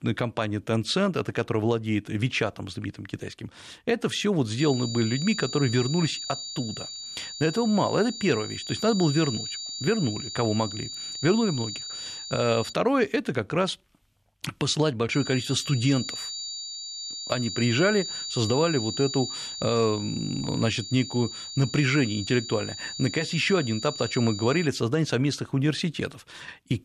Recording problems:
high-pitched whine; loud; from 4.5 to 13 s and from 15 to 25 s; 4.5 kHz, 7 dB below the speech

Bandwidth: 13.5 kHz